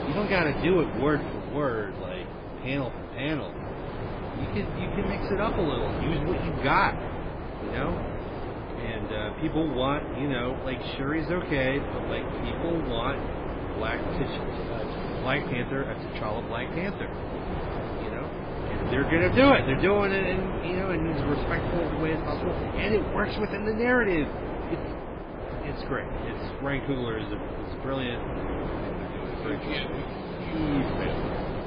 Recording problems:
garbled, watery; badly
wind noise on the microphone; heavy; 5 dB below the speech

